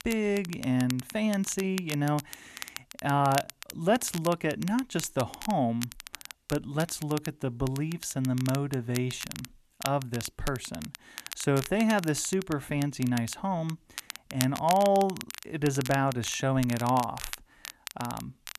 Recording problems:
crackle, like an old record; noticeable; 10 dB below the speech

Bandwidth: 13.5 kHz